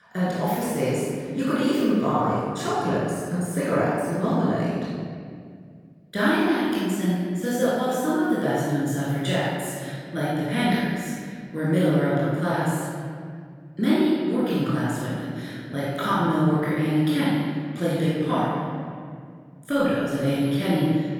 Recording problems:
room echo; strong; dies away in 2.3 s
off-mic speech; far

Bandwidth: 18 kHz